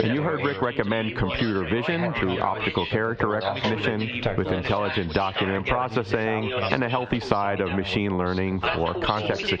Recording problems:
muffled; very slightly; fading above 4 kHz
squashed, flat; somewhat
background chatter; loud; throughout; 3 voices, 4 dB below the speech

